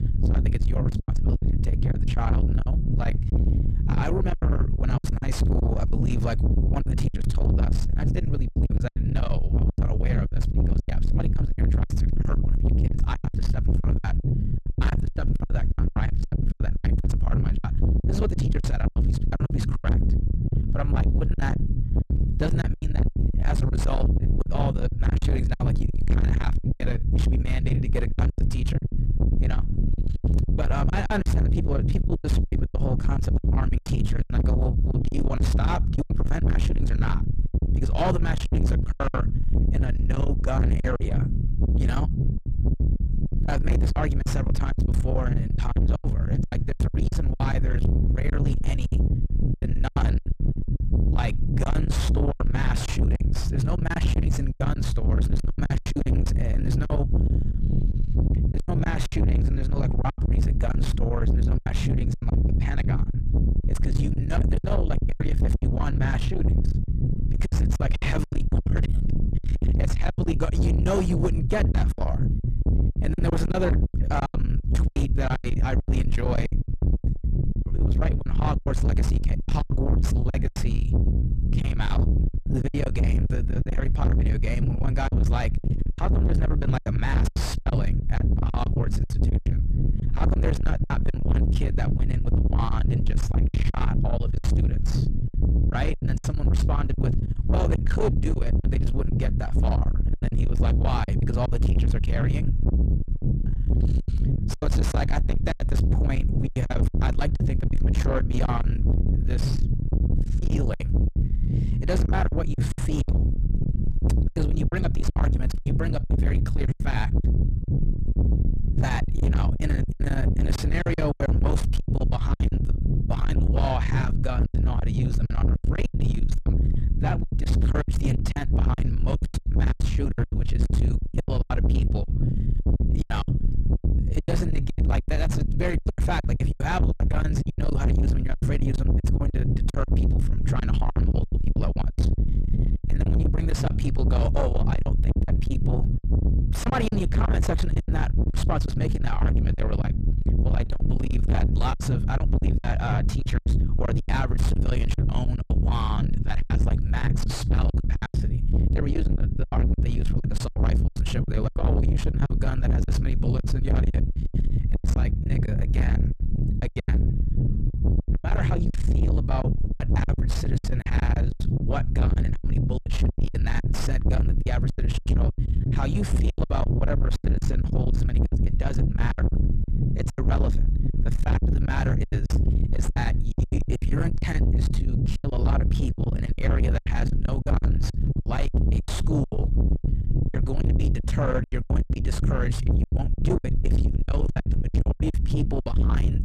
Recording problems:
distortion; heavy; 6 dB below the speech
low rumble; loud; throughout; 4 dB below the speech
choppy; very; 13% of the speech affected

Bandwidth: 14.5 kHz